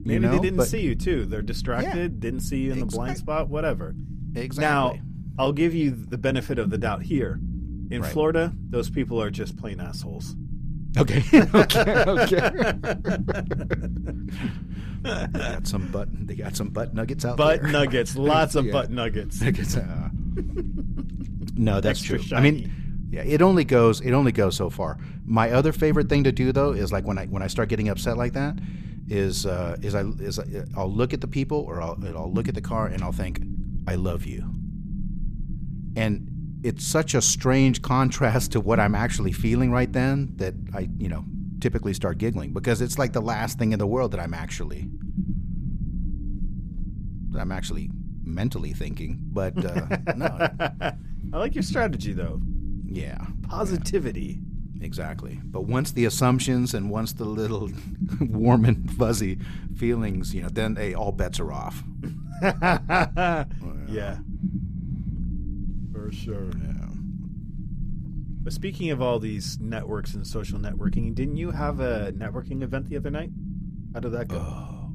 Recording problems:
low rumble; noticeable; throughout; 15 dB below the speech

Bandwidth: 14.5 kHz